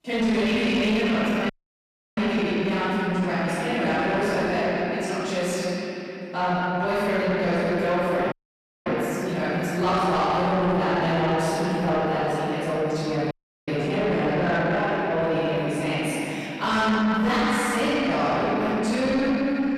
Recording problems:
room echo; strong; dies away in 3 s
off-mic speech; far
distortion; slight; 10 dB below the speech
audio cutting out; at 1.5 s for 0.5 s, at 8.5 s for 0.5 s and at 13 s

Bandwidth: 13.5 kHz